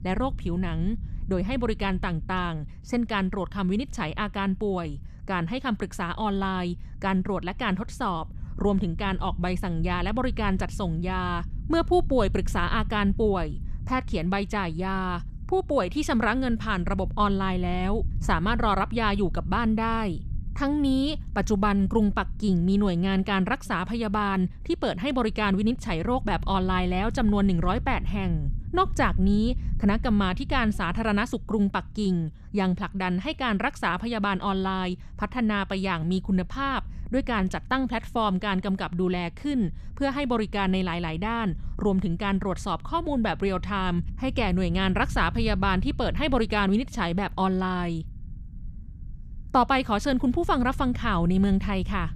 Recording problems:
low rumble; faint; throughout; 25 dB below the speech

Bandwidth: 14 kHz